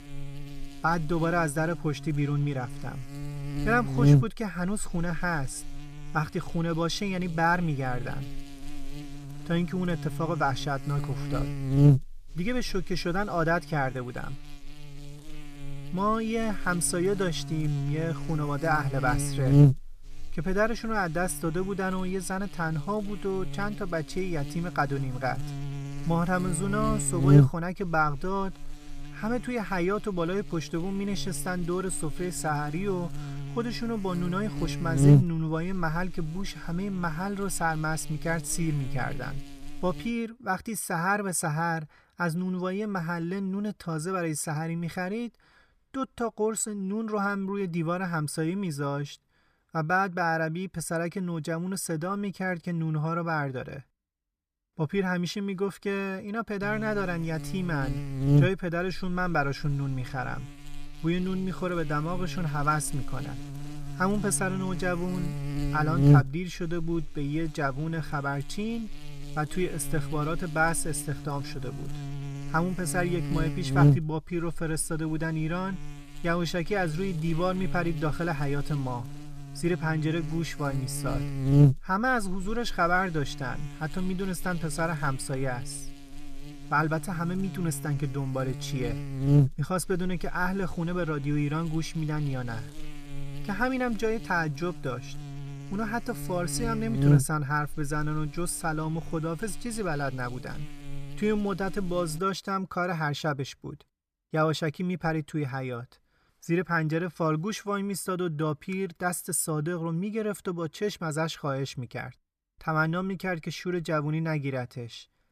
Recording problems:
electrical hum; loud; until 40 s and from 57 s to 1:42; 60 Hz, 8 dB below the speech

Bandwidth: 14.5 kHz